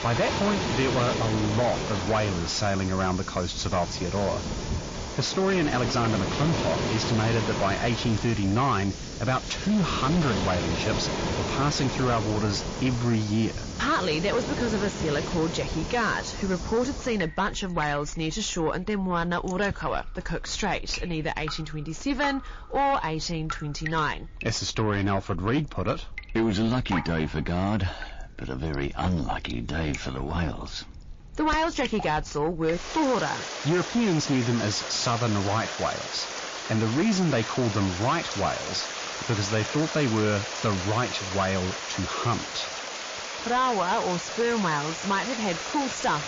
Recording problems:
distortion; slight; 10 dB below the speech
garbled, watery; slightly
rain or running water; loud; throughout; 5 dB below the speech

